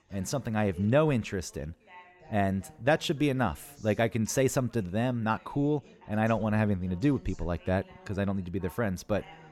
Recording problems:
background chatter; faint; throughout; 3 voices, 25 dB below the speech

